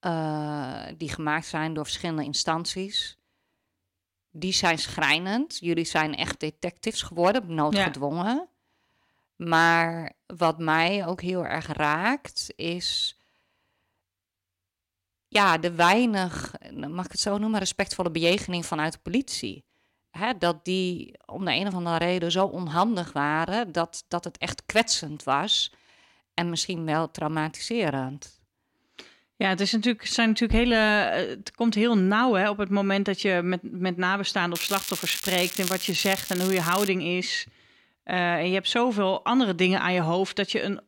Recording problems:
crackling; loud; from 35 to 37 s; 6 dB below the speech

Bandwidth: 16.5 kHz